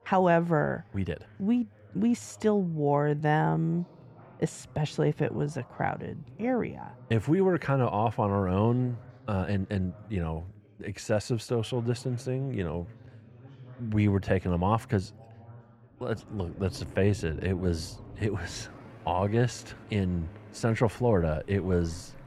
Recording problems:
muffled; slightly; fading above 3 kHz
rain or running water; noticeable; from 16 s on; 20 dB below the speech
background chatter; faint; throughout; 4 voices, 25 dB below the speech
uneven, jittery; strongly; from 1 to 20 s

